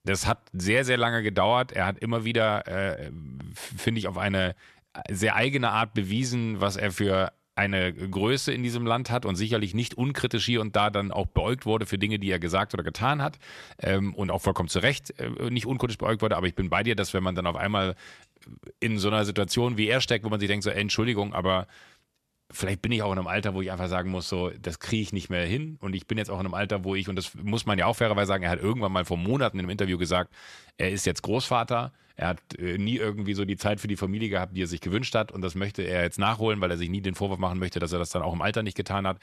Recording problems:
none

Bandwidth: 13.5 kHz